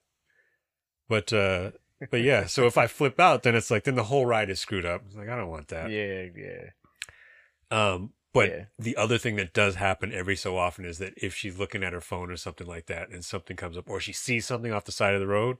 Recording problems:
none

